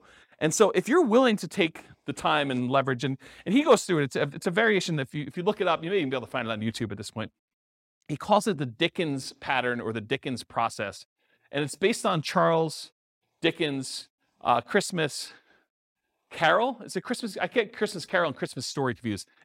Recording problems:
none

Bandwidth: 16 kHz